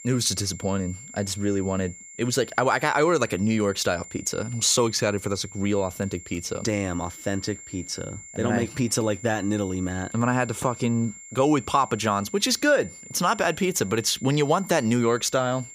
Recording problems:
high-pitched whine; noticeable; throughout; 7.5 kHz, 15 dB below the speech

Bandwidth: 15 kHz